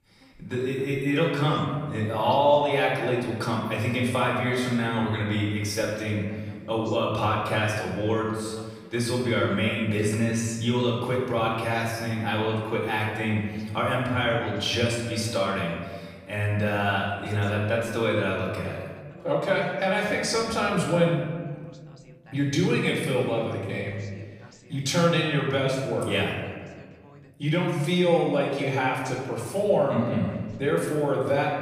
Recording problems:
off-mic speech; far
room echo; noticeable; dies away in 1.4 s
voice in the background; faint; throughout; 25 dB below the speech

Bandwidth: 15 kHz